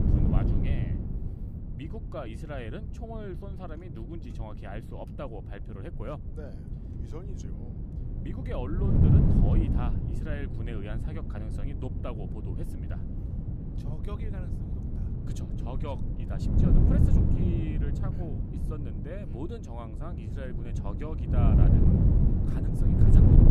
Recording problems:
wind noise on the microphone; heavy; 4 dB above the speech

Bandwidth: 14 kHz